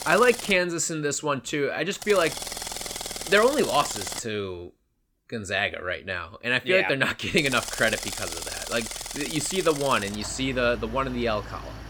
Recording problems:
machinery noise; loud; throughout; 8 dB below the speech

